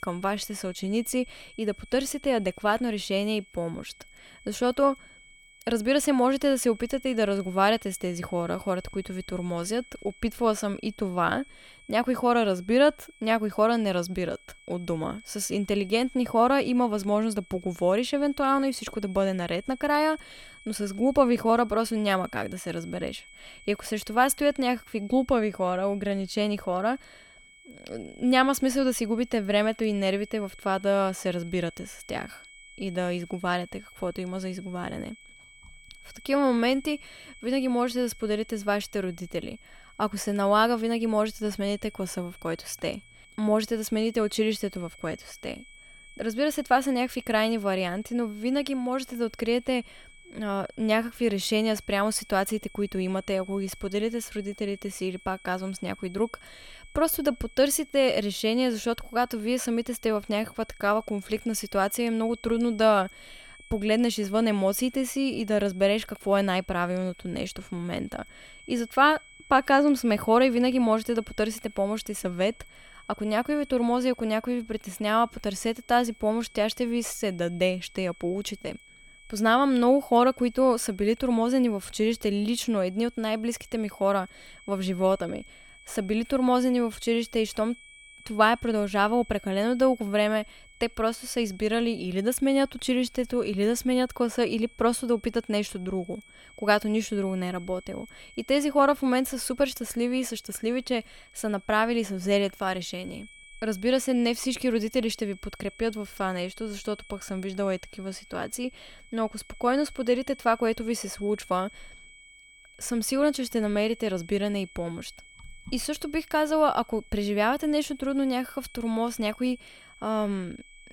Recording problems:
high-pitched whine; faint; throughout; 2 kHz, 25 dB below the speech

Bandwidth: 18 kHz